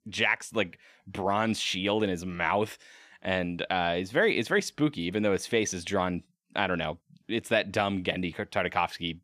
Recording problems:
none

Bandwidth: 14.5 kHz